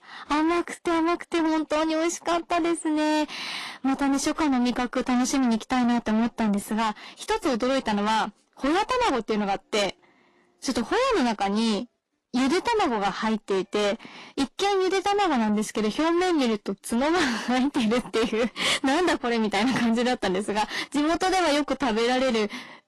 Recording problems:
distortion; heavy; 6 dB below the speech
garbled, watery; slightly; nothing above 11.5 kHz

